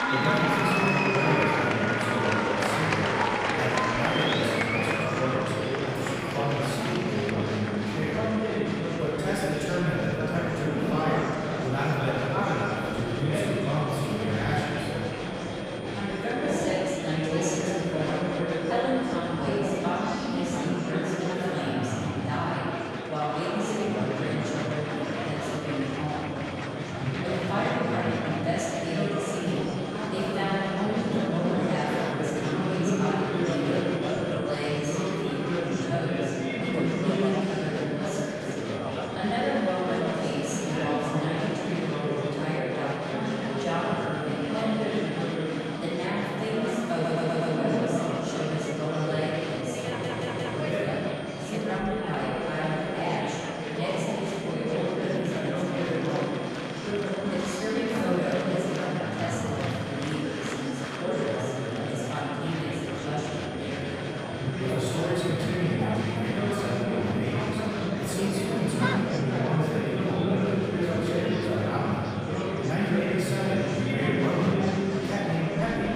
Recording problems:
room echo; strong; dies away in 2.9 s
off-mic speech; far
murmuring crowd; very loud; throughout; 1 dB above the speech
high-pitched whine; noticeable; throughout; 3 kHz, 20 dB below the speech
audio stuttering; at 47 s and at 50 s

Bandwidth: 15.5 kHz